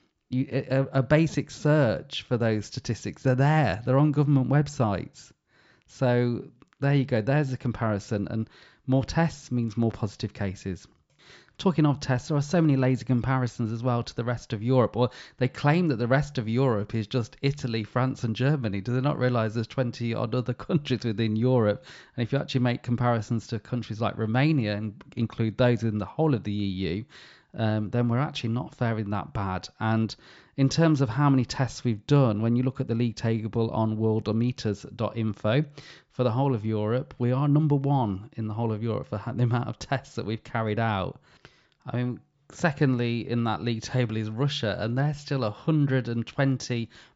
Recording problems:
high frequencies cut off; noticeable; nothing above 8 kHz

